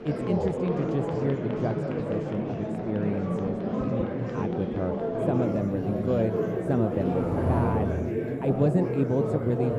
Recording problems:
muffled; very; fading above 1 kHz
murmuring crowd; very loud; throughout; 1 dB above the speech
traffic noise; loud; throughout; 2 dB below the speech
alarms or sirens; faint; throughout; 20 dB below the speech

